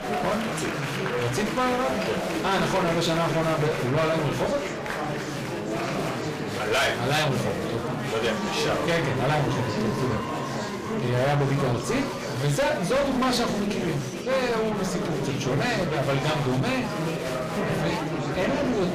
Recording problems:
distortion; heavy; 24% of the sound clipped
room echo; slight; dies away in 0.3 s
off-mic speech; somewhat distant
murmuring crowd; loud; throughout; 3 dB below the speech

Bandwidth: 15 kHz